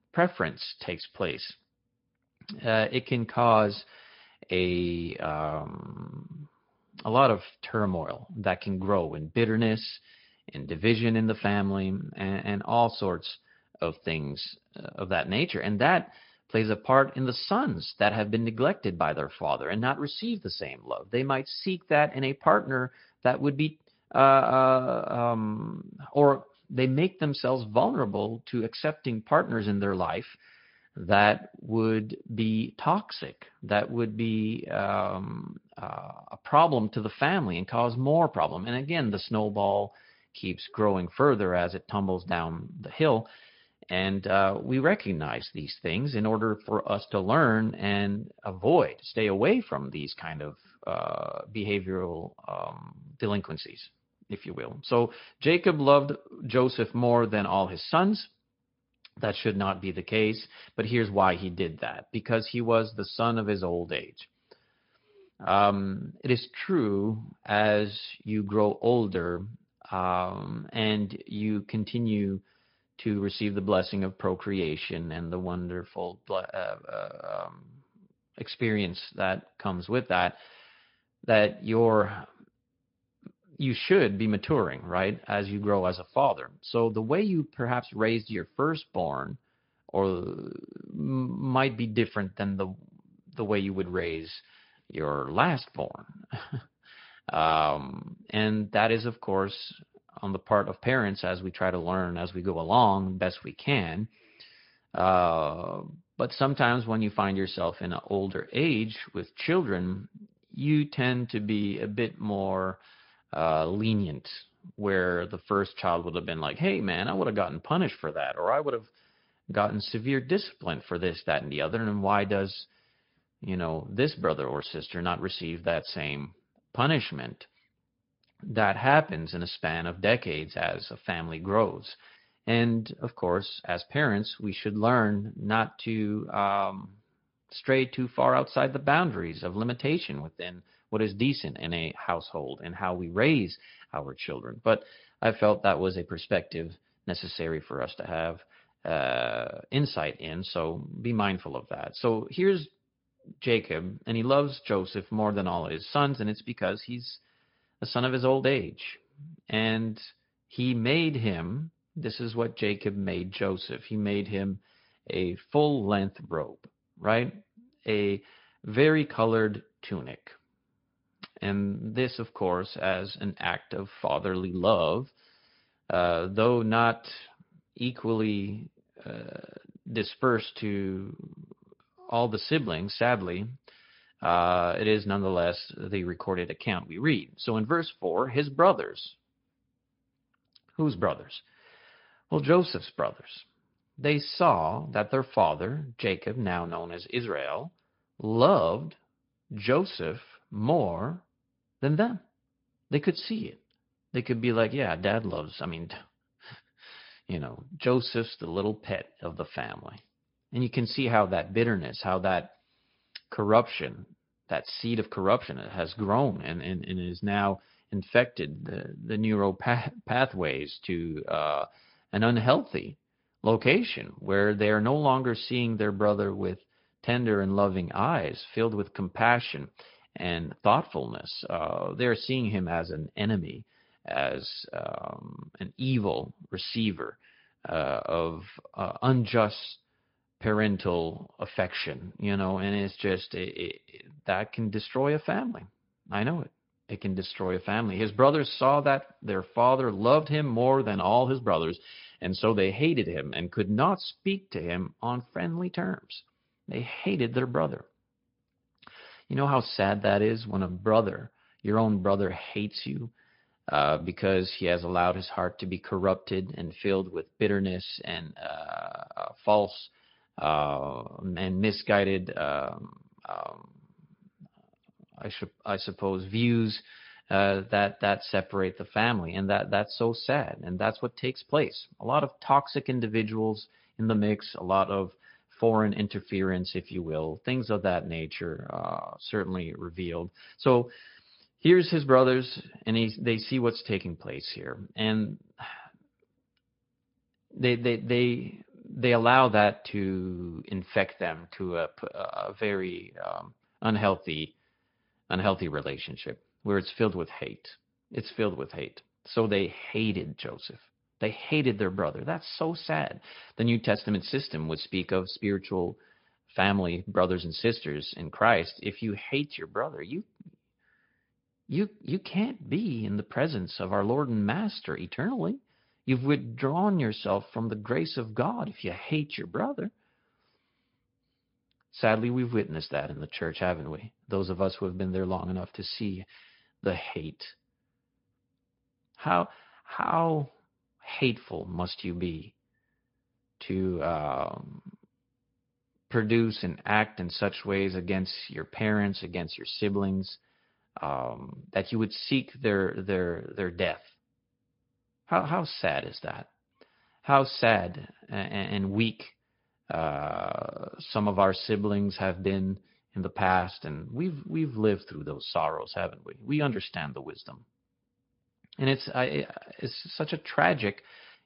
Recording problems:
high frequencies cut off; noticeable; nothing above 5 kHz
garbled, watery; slightly

